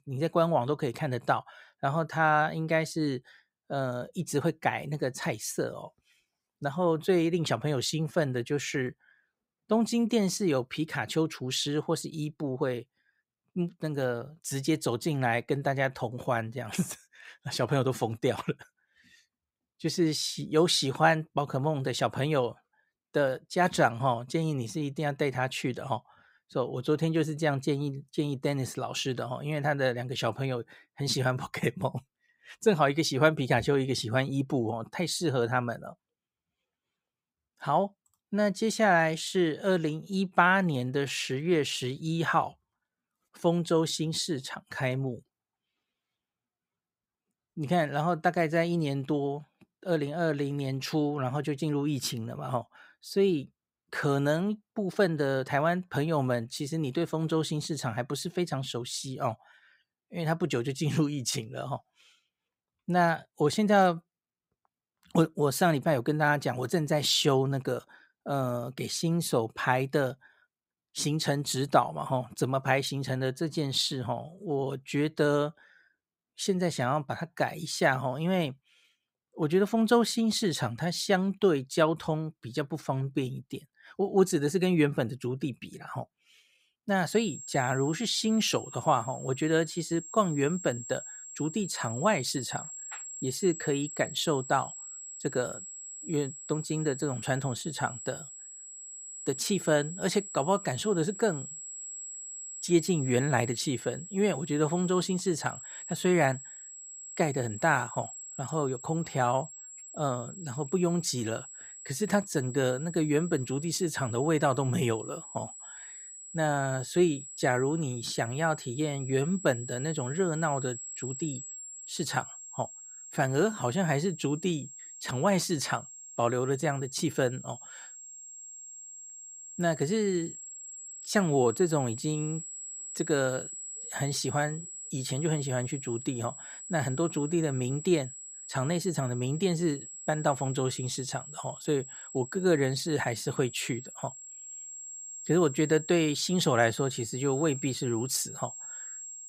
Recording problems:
high-pitched whine; noticeable; from 1:27 on; 7.5 kHz, 10 dB below the speech

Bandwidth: 15.5 kHz